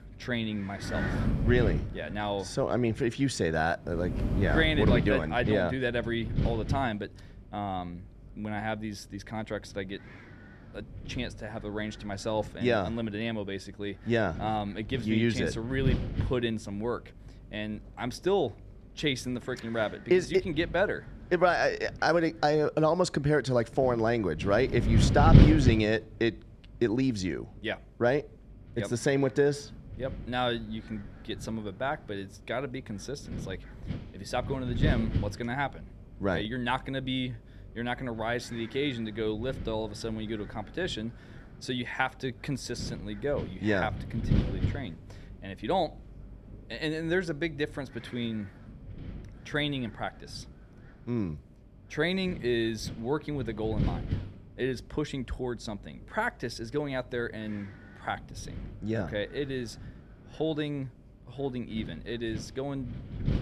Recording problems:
wind noise on the microphone; occasional gusts; 10 dB below the speech

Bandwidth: 14 kHz